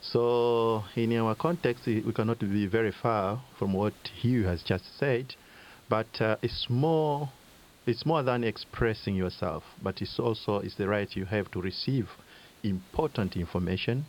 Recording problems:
high frequencies cut off; noticeable; nothing above 5.5 kHz
hiss; faint; throughout; 25 dB below the speech

